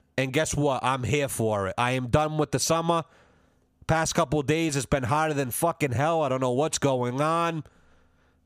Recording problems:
squashed, flat; heavily

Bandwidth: 15 kHz